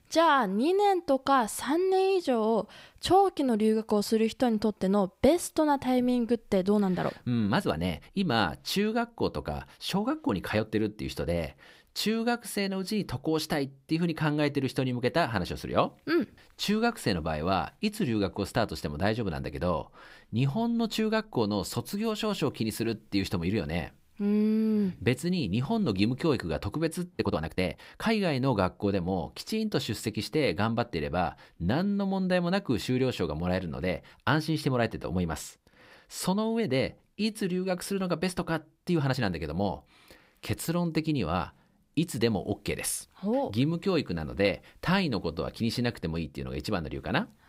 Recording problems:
uneven, jittery; strongly; from 7 to 39 s

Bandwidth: 15.5 kHz